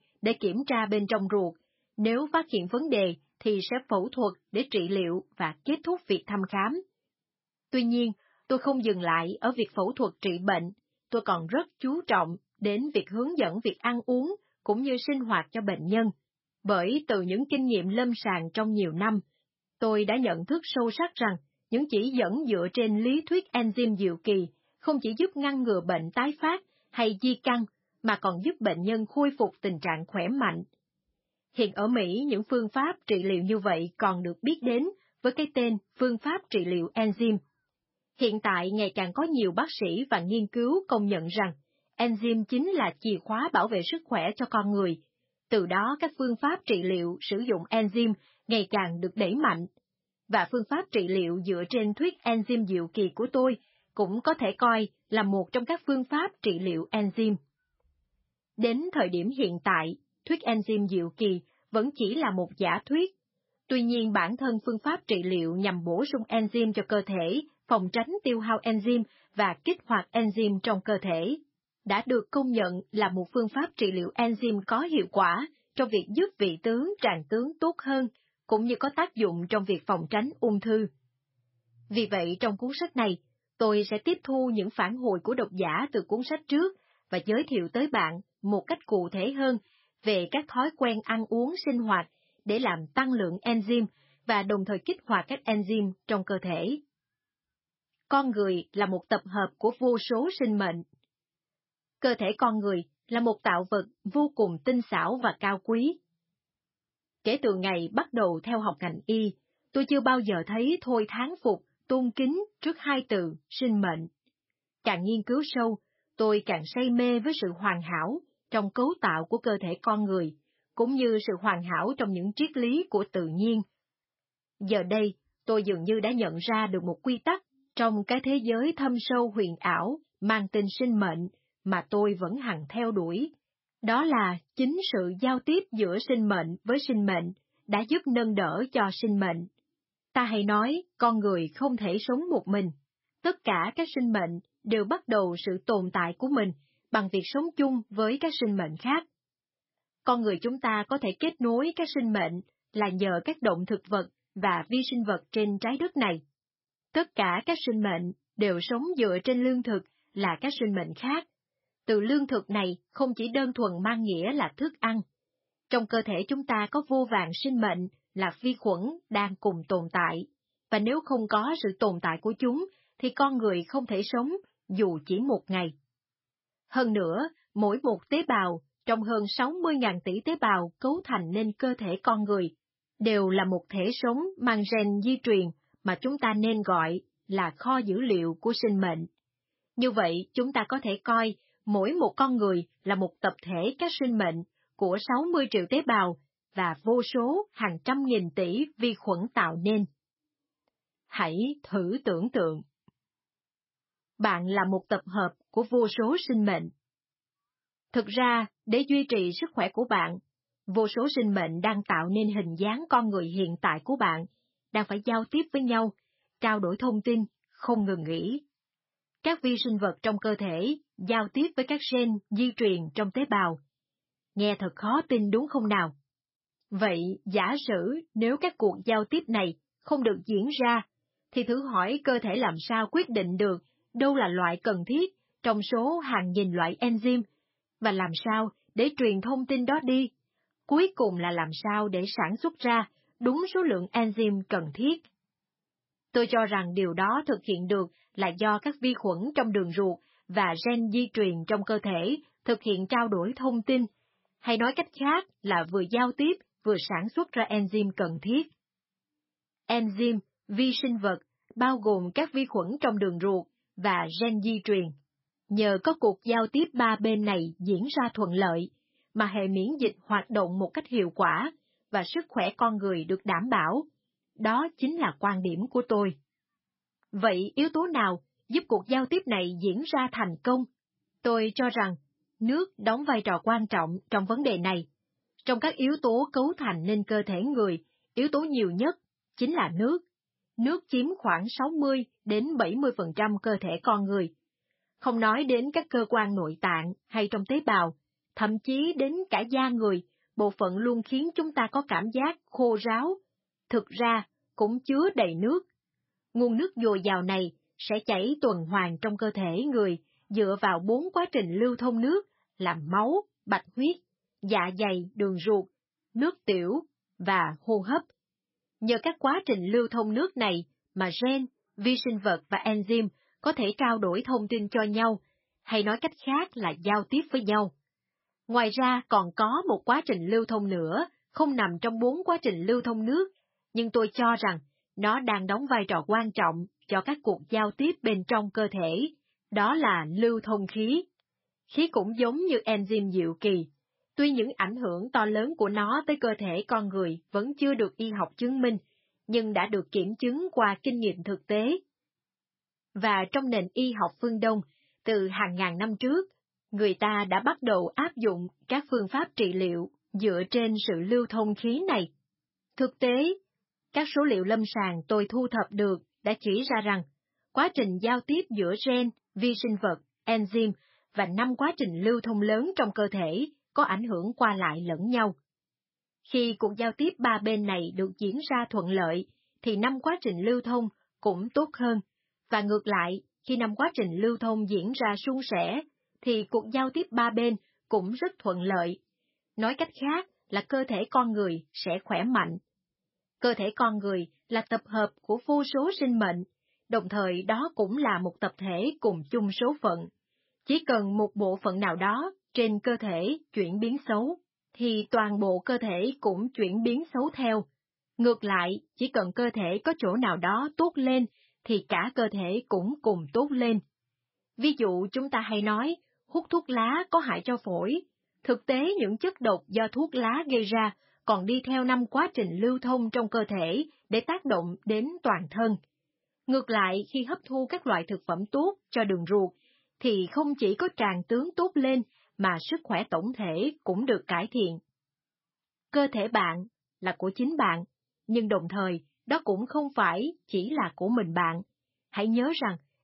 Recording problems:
garbled, watery; badly; nothing above 5.5 kHz

